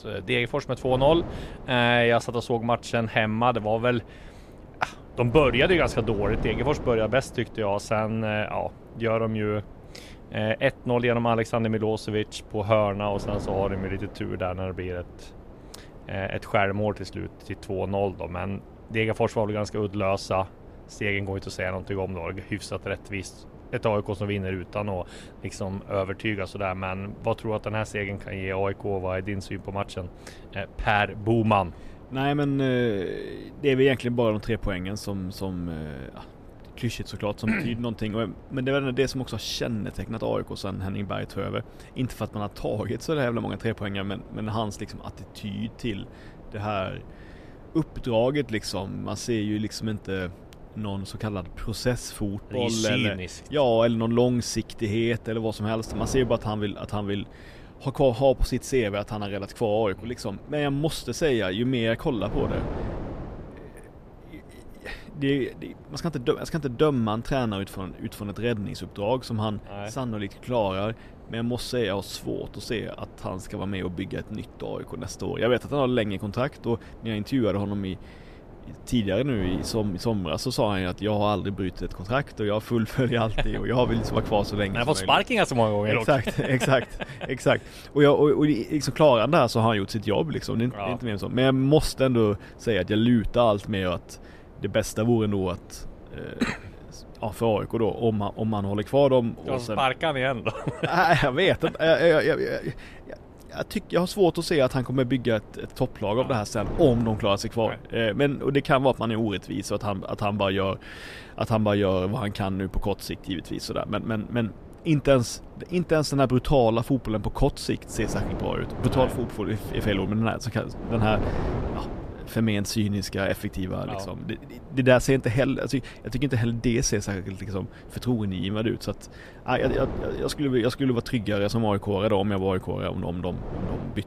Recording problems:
wind noise on the microphone; occasional gusts; 20 dB below the speech

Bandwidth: 14.5 kHz